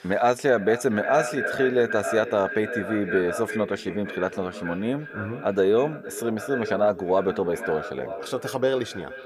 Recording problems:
echo of what is said; strong; throughout; 460 ms later, 8 dB below the speech

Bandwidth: 15 kHz